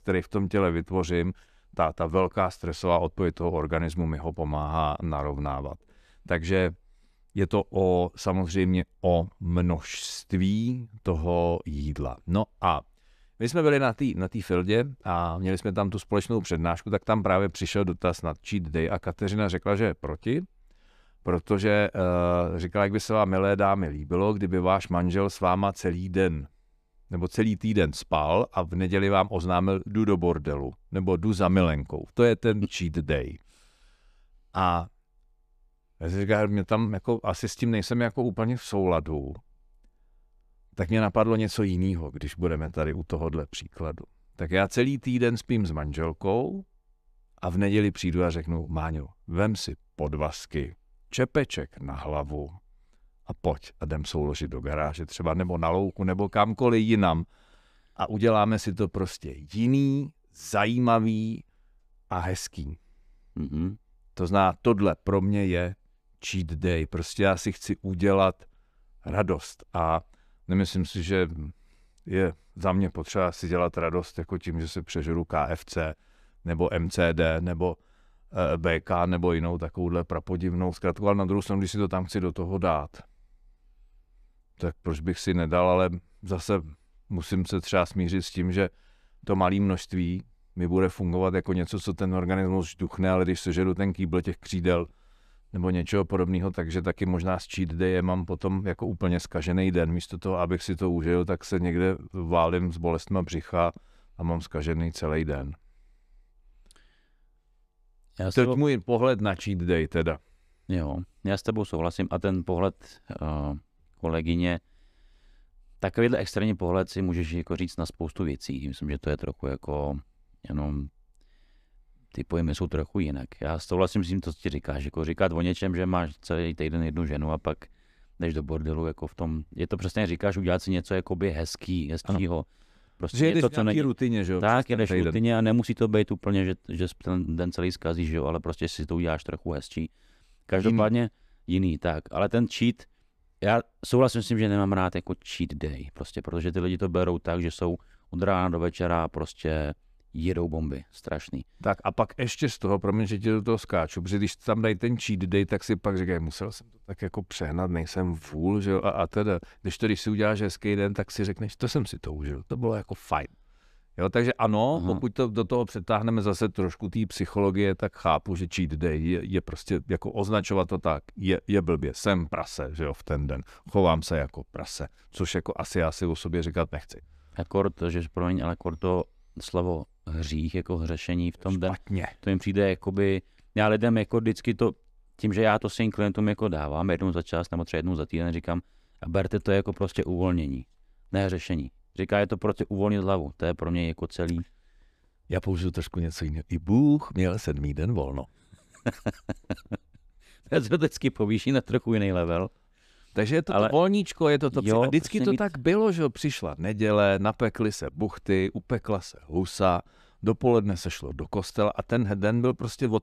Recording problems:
none

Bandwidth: 14.5 kHz